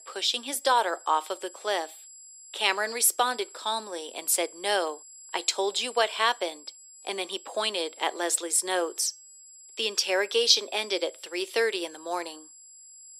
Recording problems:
thin; very; fading below 350 Hz
high-pitched whine; noticeable; throughout; 7.5 kHz, 20 dB below the speech

